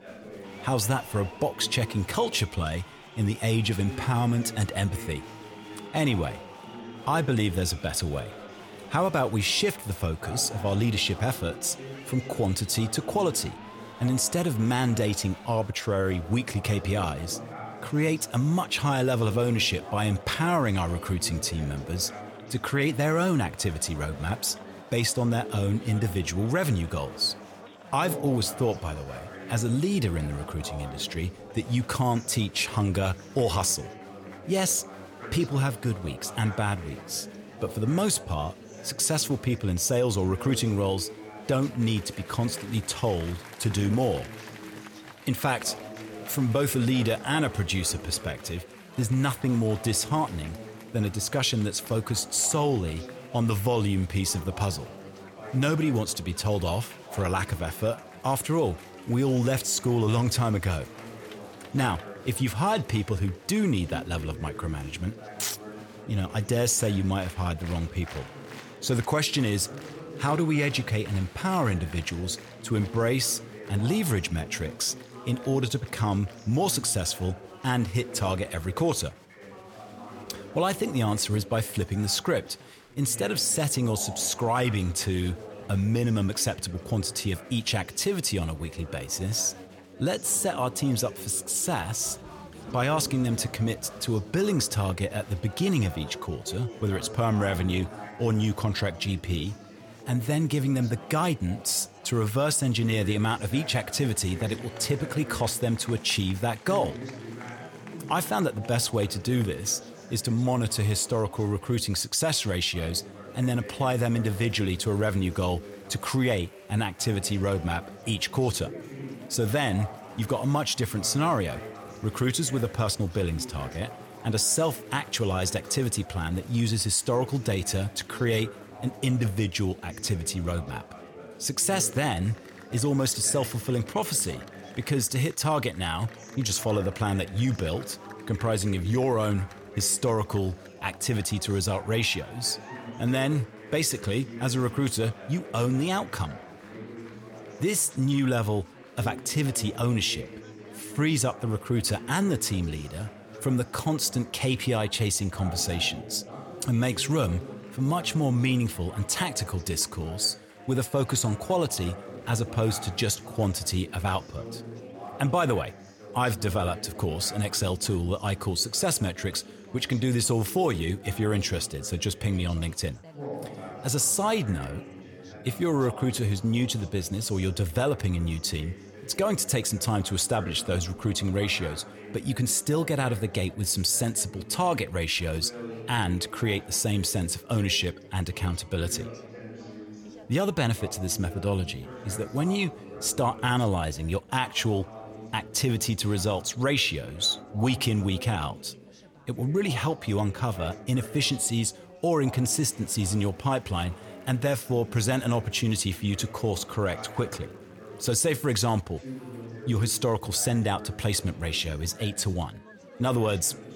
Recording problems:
chatter from many people; noticeable; throughout; 15 dB below the speech

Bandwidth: 18.5 kHz